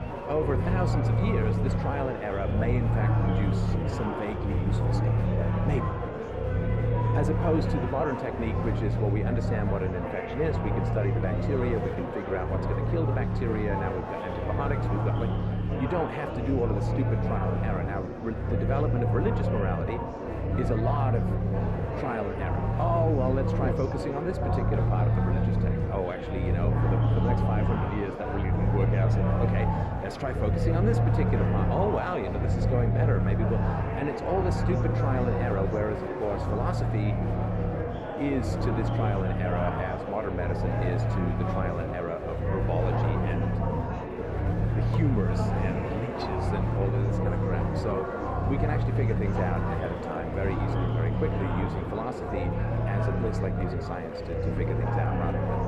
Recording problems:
muffled; very; fading above 2.5 kHz
murmuring crowd; loud; throughout; 1 dB below the speech
low rumble; loud; throughout; 7 dB below the speech

